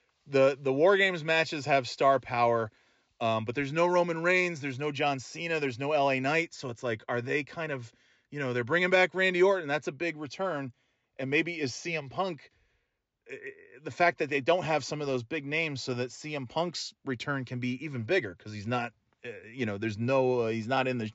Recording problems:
high frequencies cut off; noticeable; nothing above 7.5 kHz

